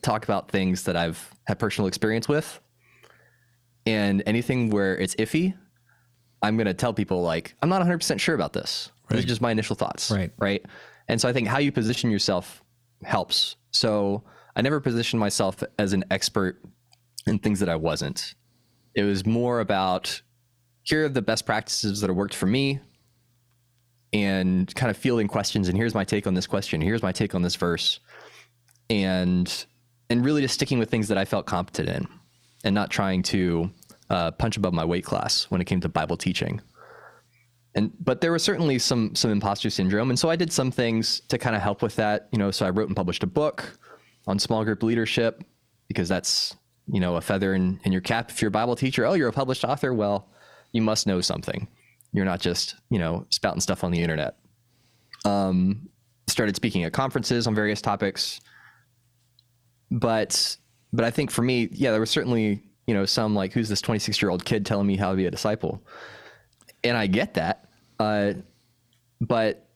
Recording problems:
squashed, flat; somewhat

